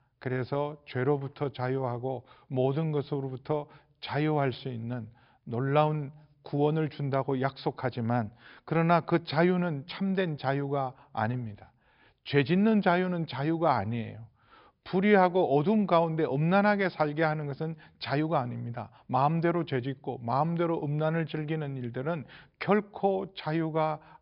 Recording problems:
high frequencies cut off; noticeable; nothing above 5.5 kHz

